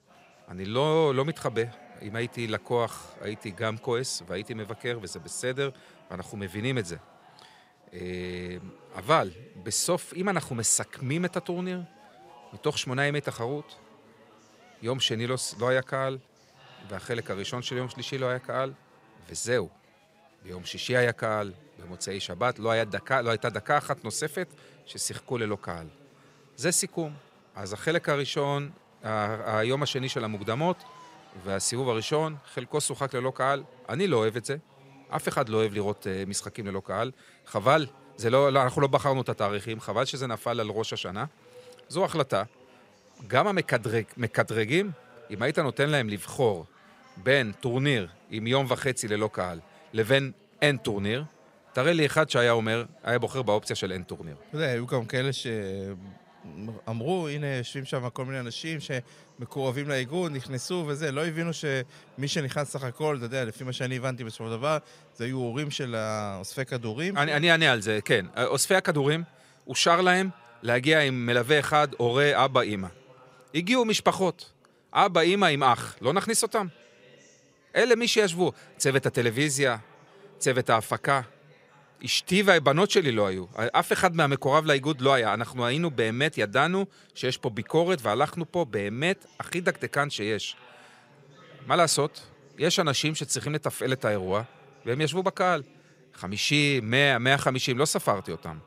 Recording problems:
chatter from many people; faint; throughout; 30 dB below the speech

